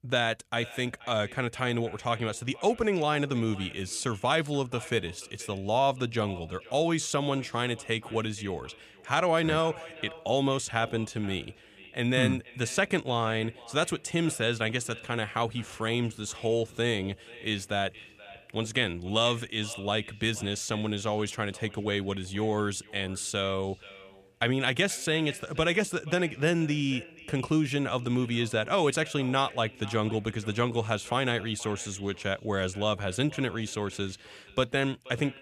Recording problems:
echo of what is said; faint; throughout; 480 ms later, 20 dB below the speech

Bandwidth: 14.5 kHz